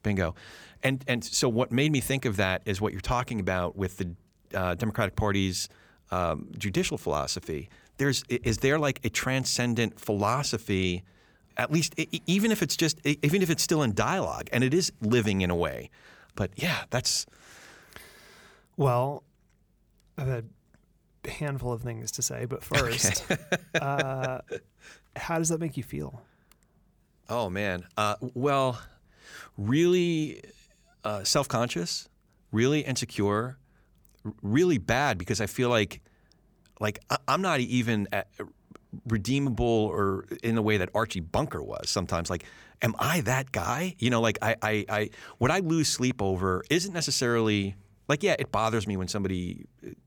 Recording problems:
none

